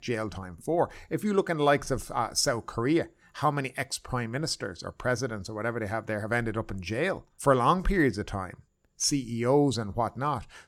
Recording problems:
none

